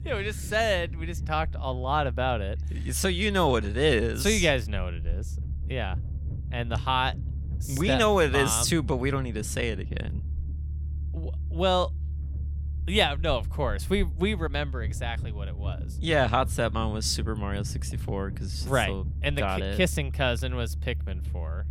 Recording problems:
low rumble; faint; throughout; 20 dB below the speech

